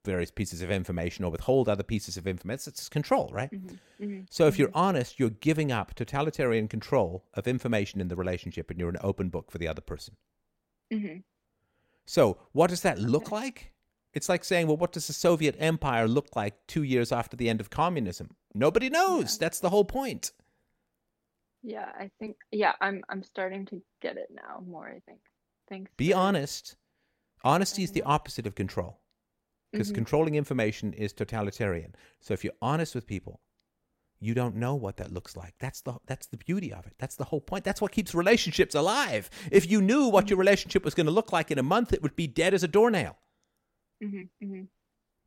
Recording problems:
none

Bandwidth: 16.5 kHz